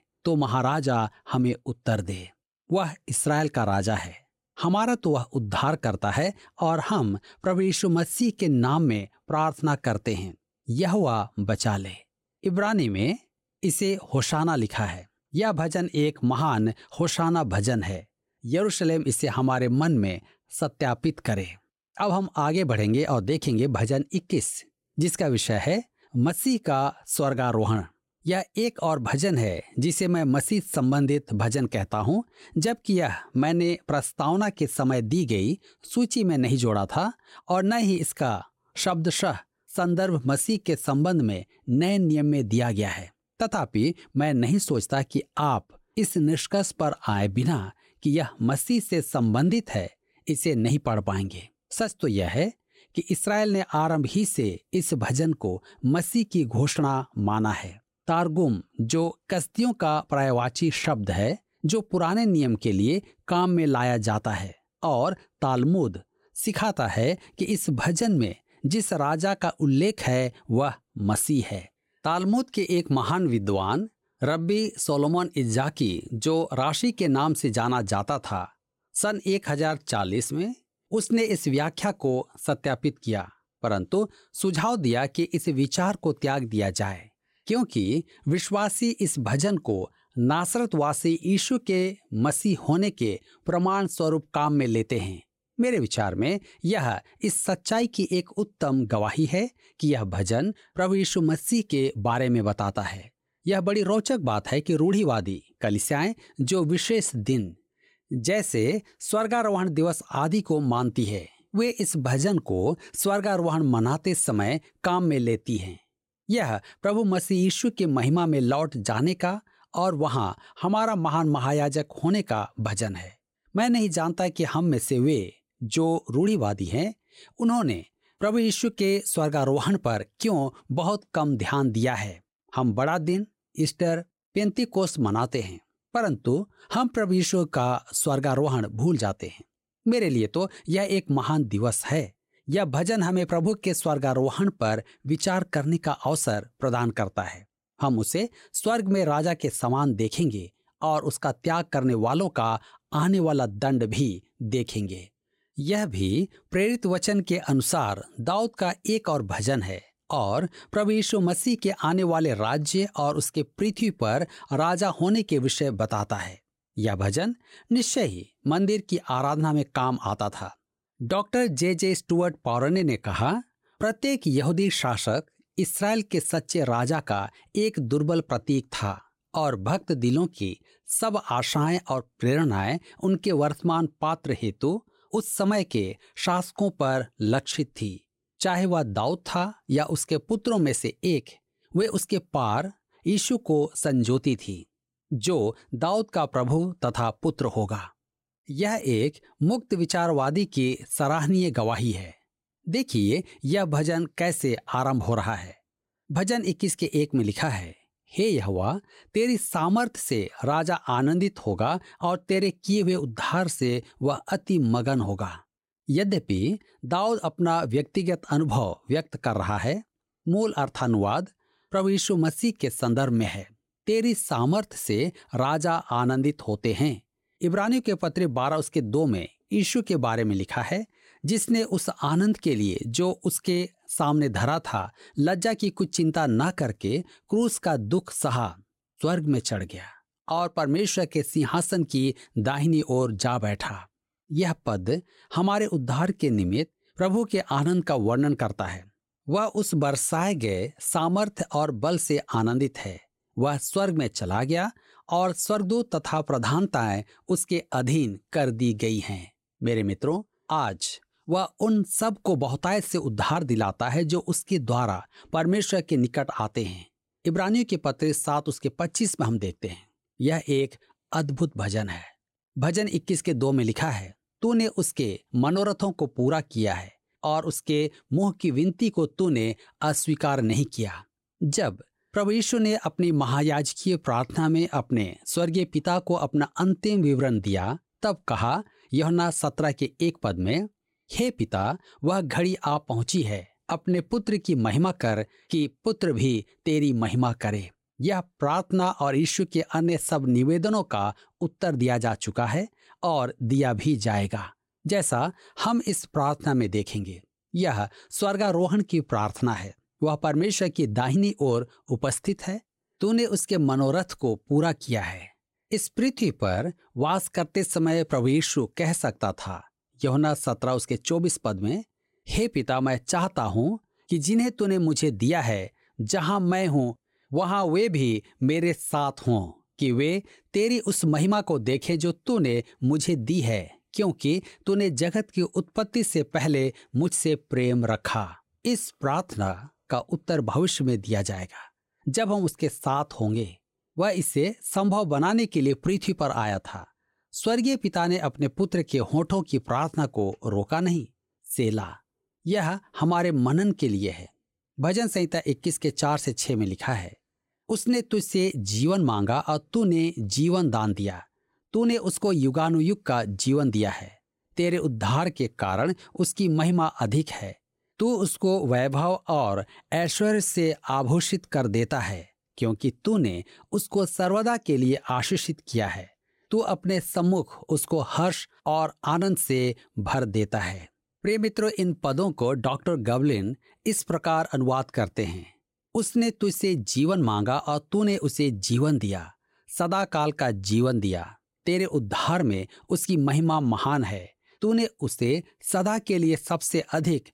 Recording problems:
none

